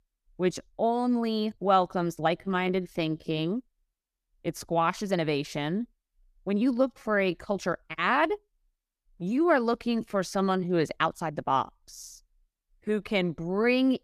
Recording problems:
uneven, jittery; strongly; from 0.5 to 13 s

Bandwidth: 14.5 kHz